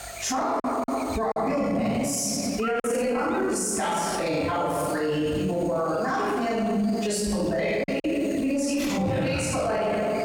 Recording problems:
room echo; strong; dies away in 1.6 s
off-mic speech; far
squashed, flat; somewhat
electrical hum; noticeable; throughout; 50 Hz, 15 dB below the speech
choppy; occasionally; 2% of the speech affected

